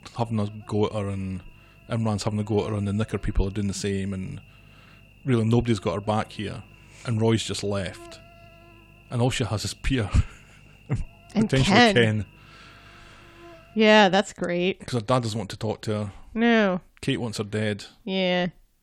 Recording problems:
electrical hum; faint; until 14 s; 50 Hz, 25 dB below the speech

